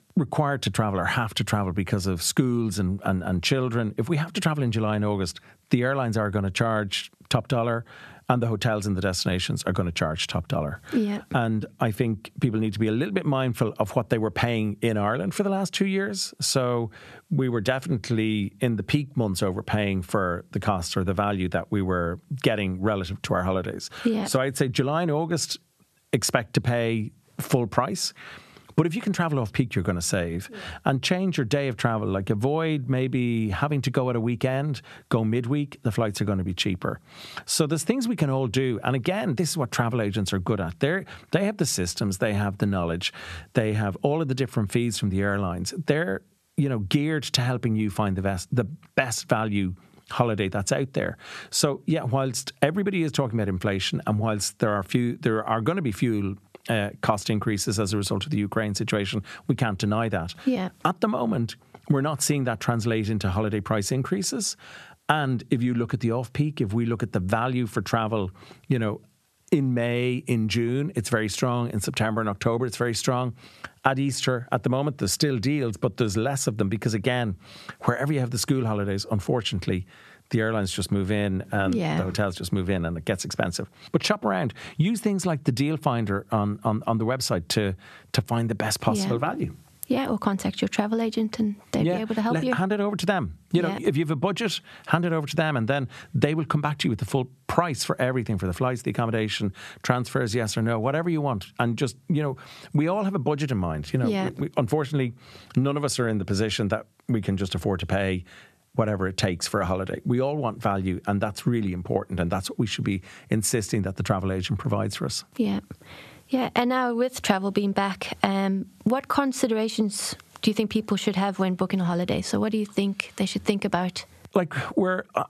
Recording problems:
squashed, flat; somewhat

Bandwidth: 13.5 kHz